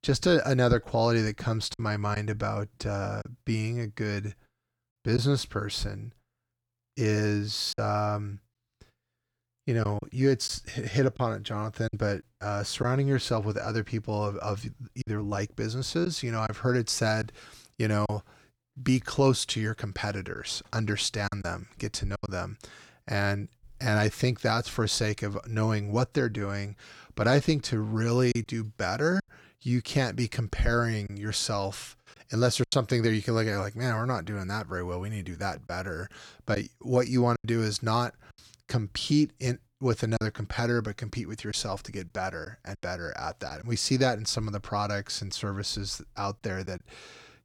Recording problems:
choppy; occasionally; 3% of the speech affected

